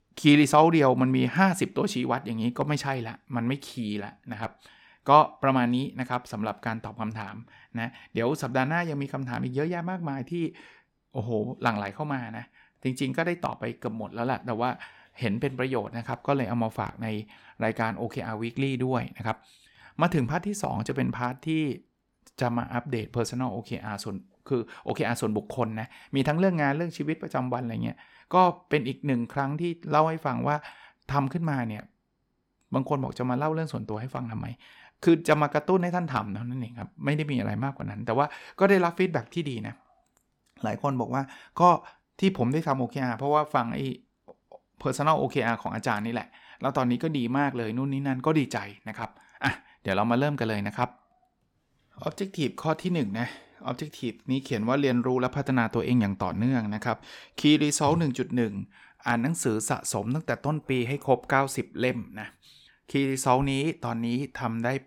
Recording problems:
none

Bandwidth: 17.5 kHz